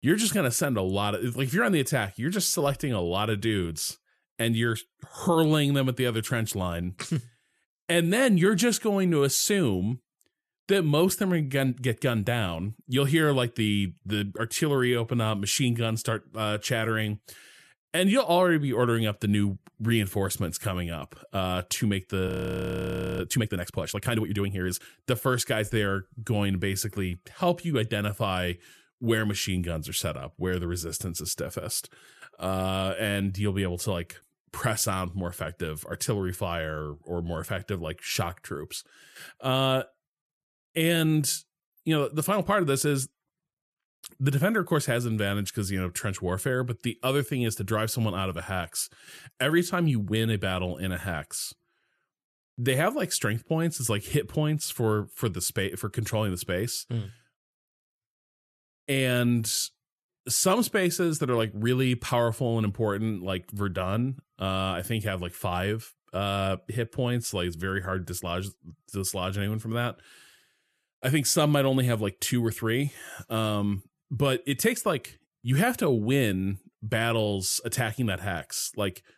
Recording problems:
audio freezing; at 22 s for 1 s

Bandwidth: 14 kHz